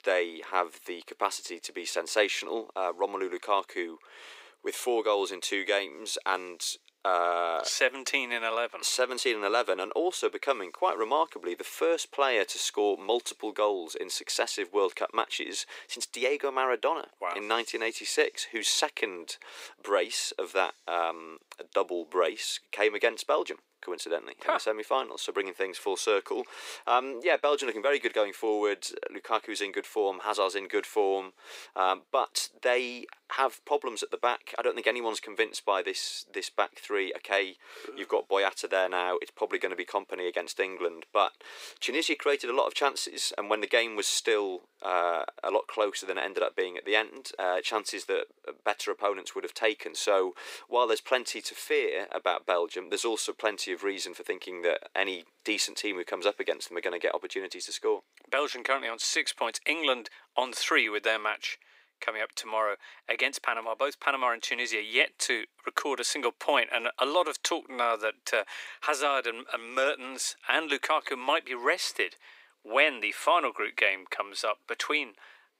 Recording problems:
thin; very; fading below 350 Hz

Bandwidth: 15.5 kHz